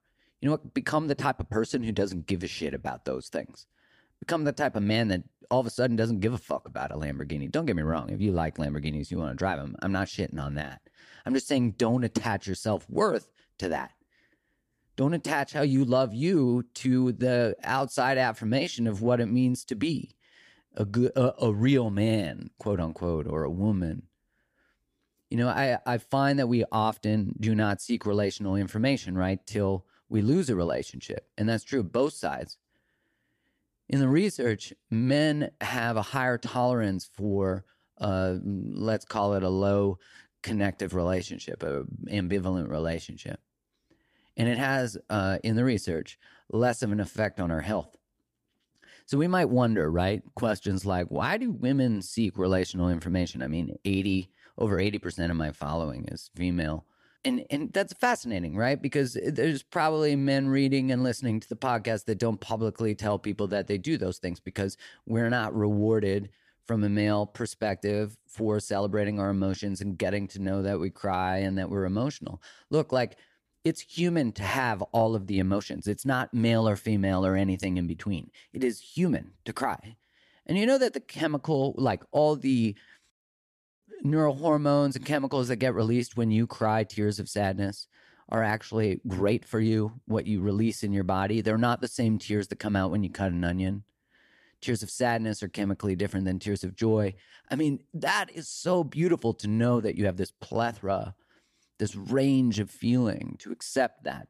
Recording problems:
none

